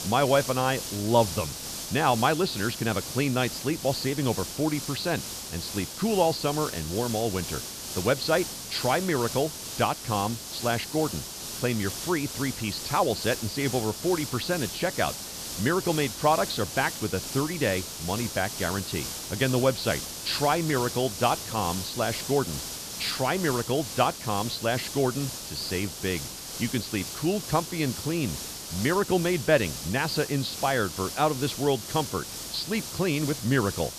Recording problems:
high frequencies cut off; noticeable; nothing above 5.5 kHz
hiss; loud; throughout; 7 dB below the speech

